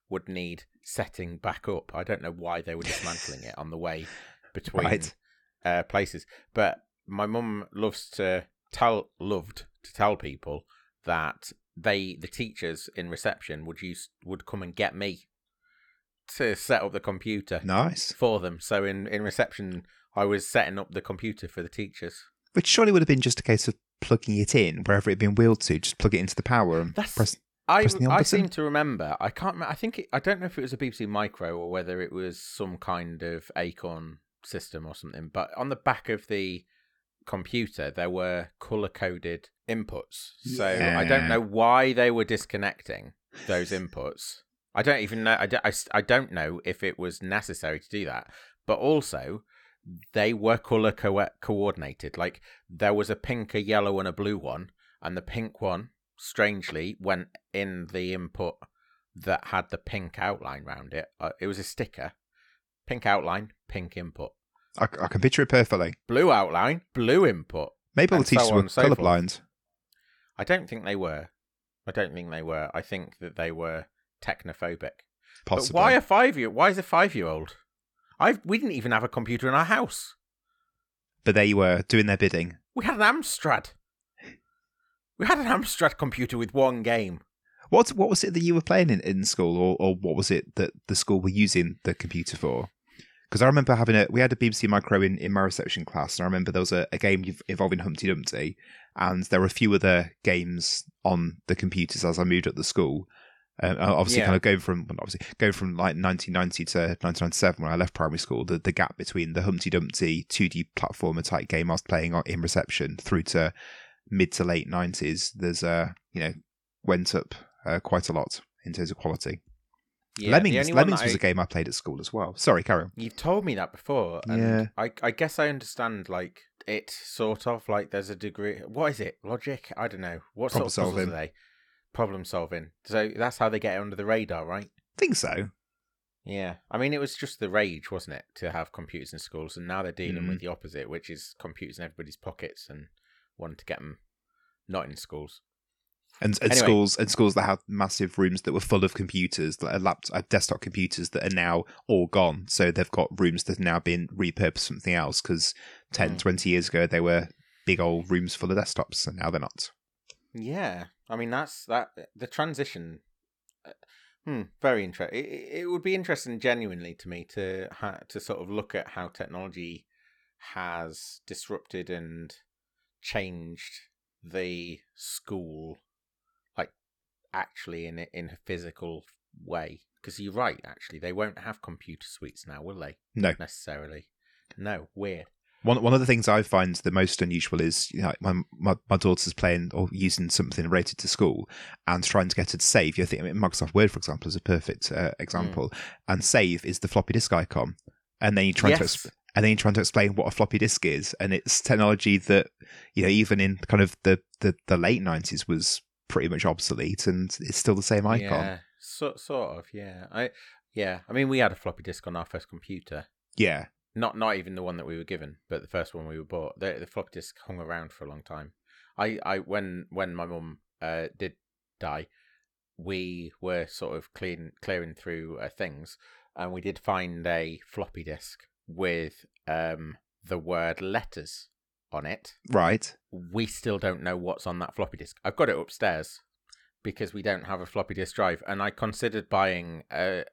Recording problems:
none

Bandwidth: 18.5 kHz